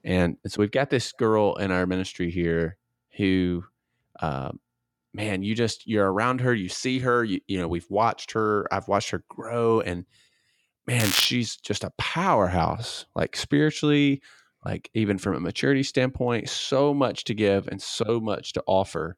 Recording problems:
crackling; loud; at 11 s; 2 dB below the speech

